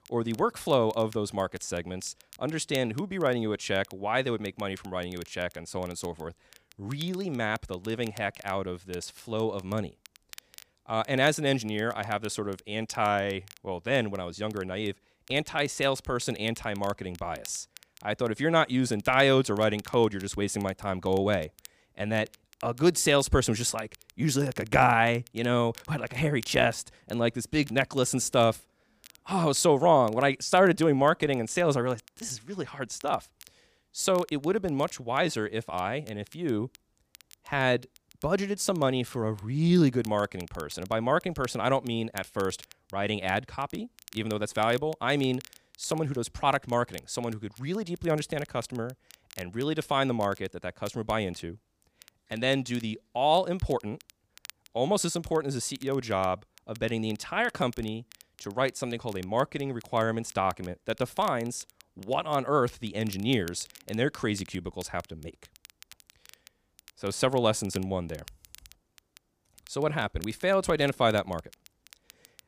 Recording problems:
crackle, like an old record; faint; 25 dB below the speech

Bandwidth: 15 kHz